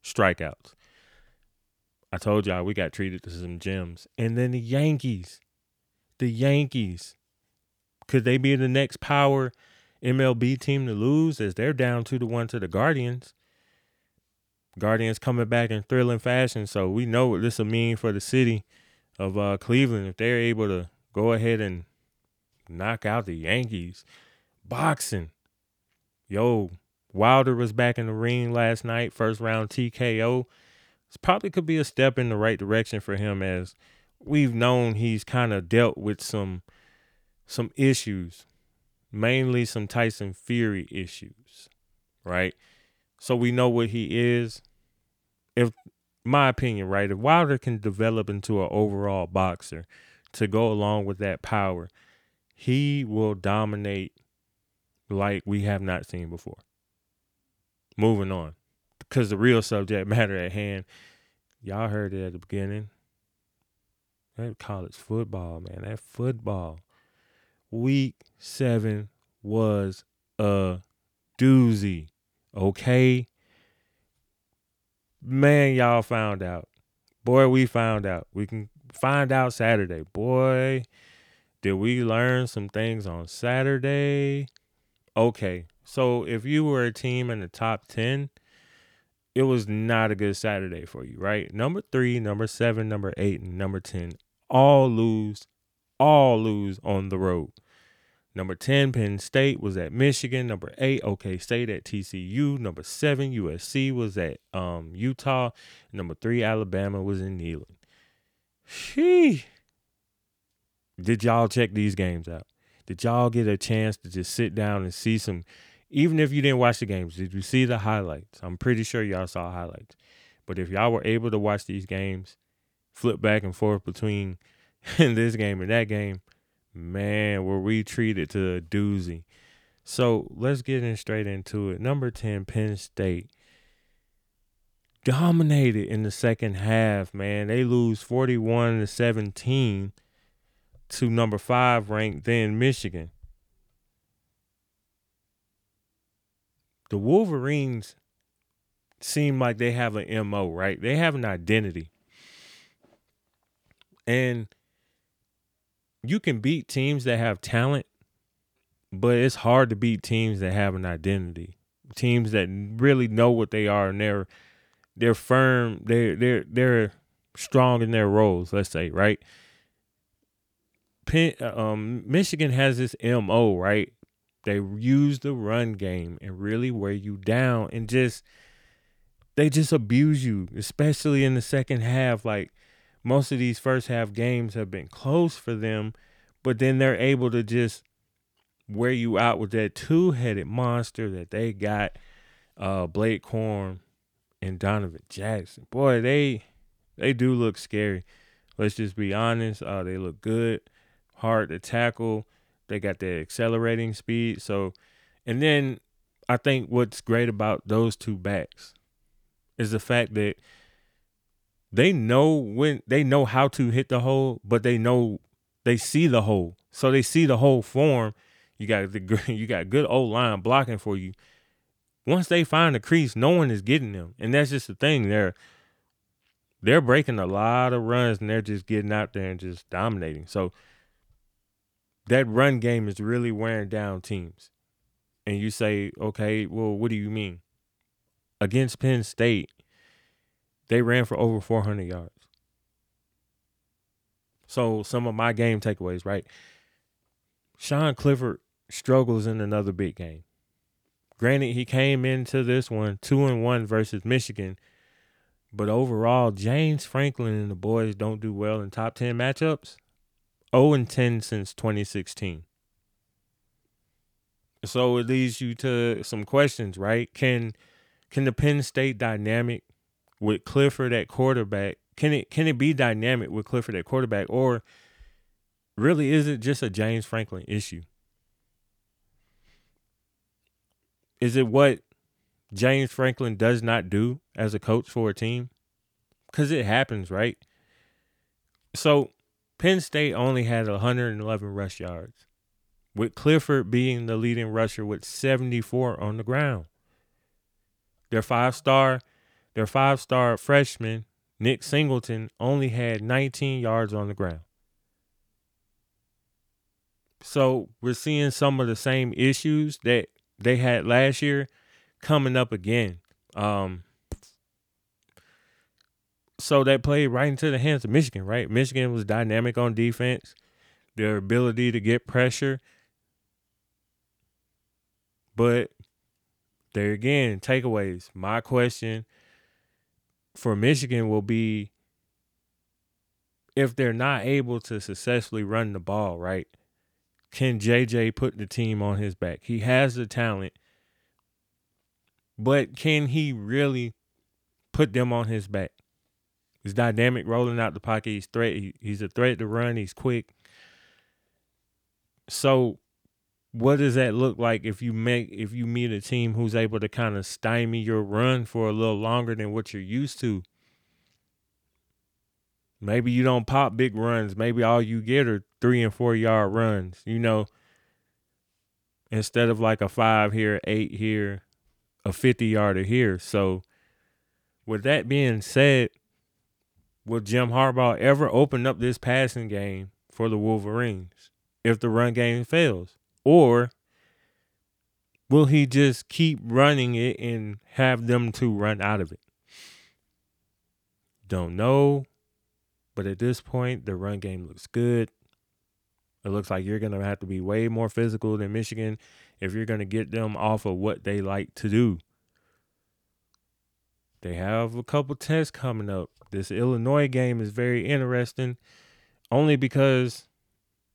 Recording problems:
none

